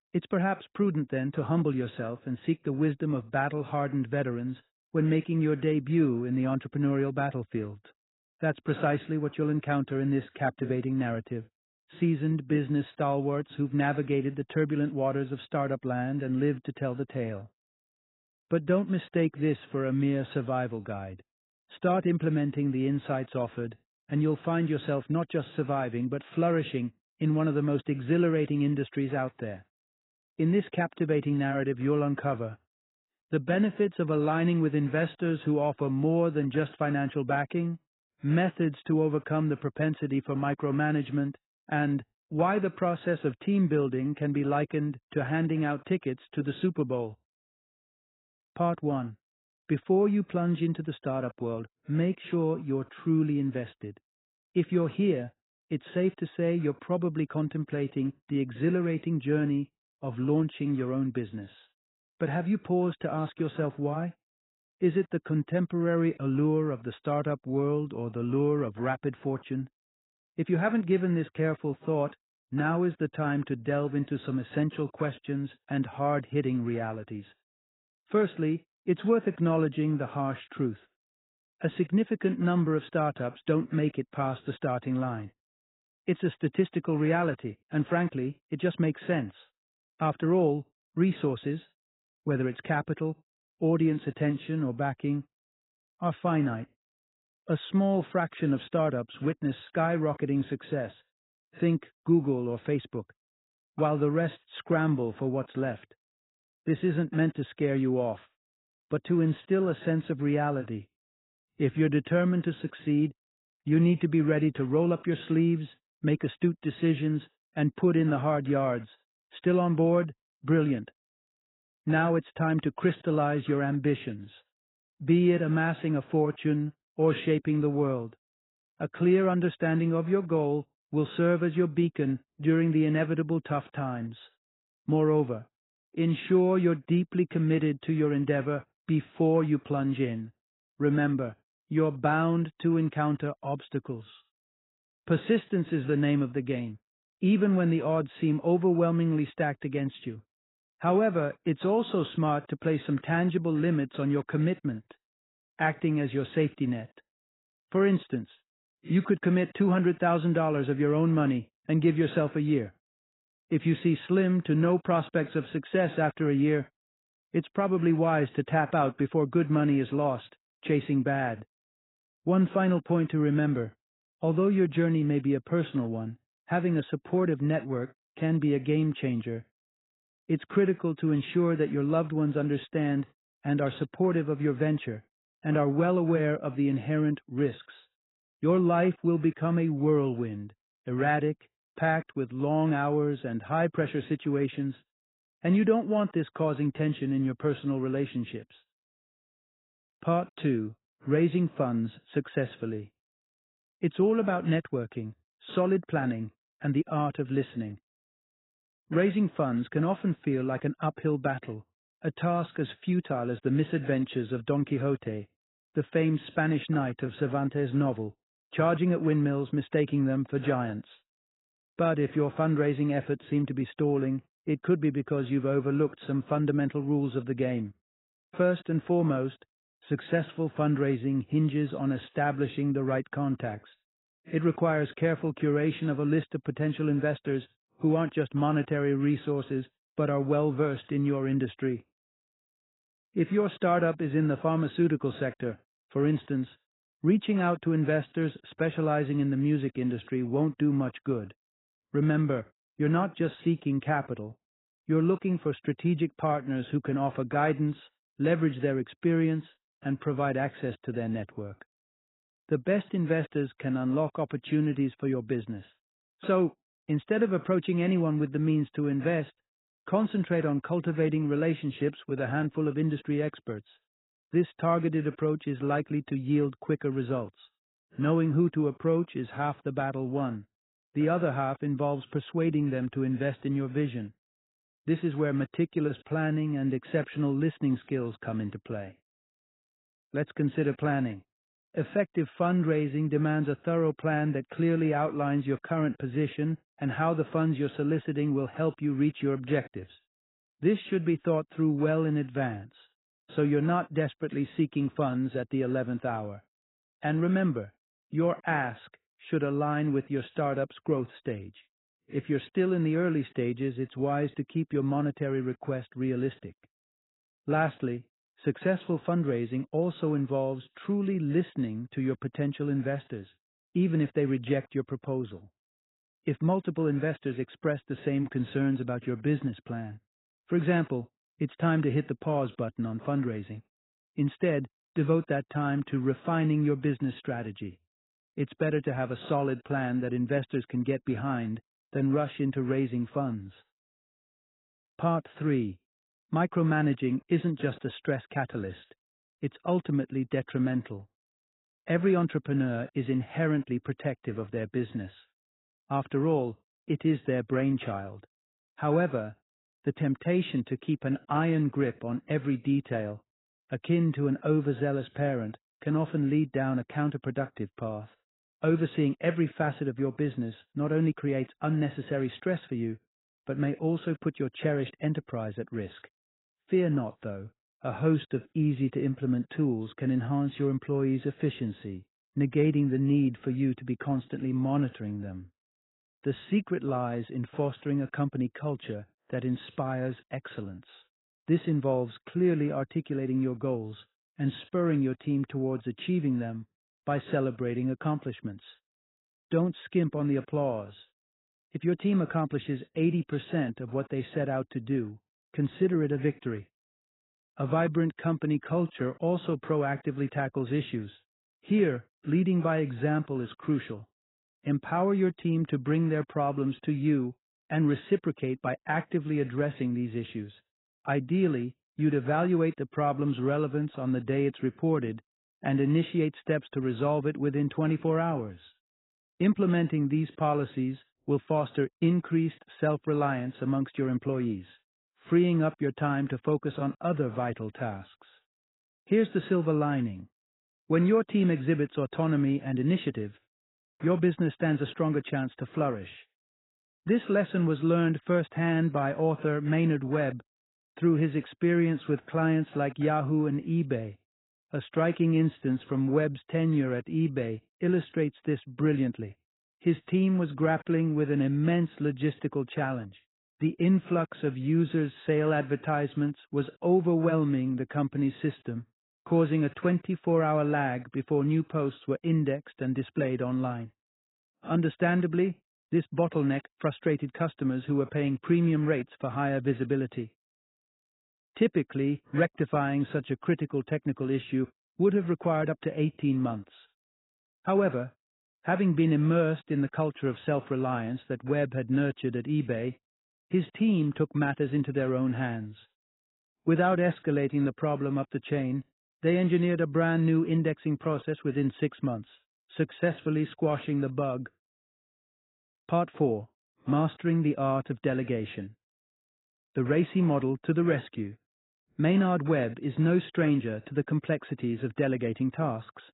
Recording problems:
garbled, watery; badly; nothing above 4 kHz

